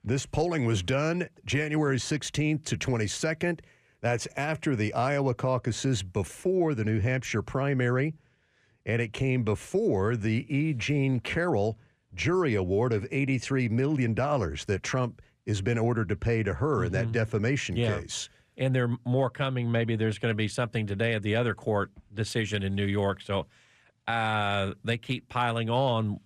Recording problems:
none

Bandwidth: 14.5 kHz